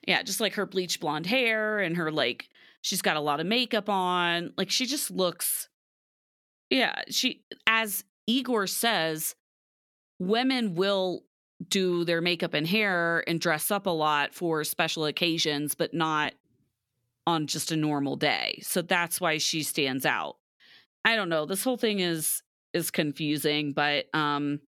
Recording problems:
none

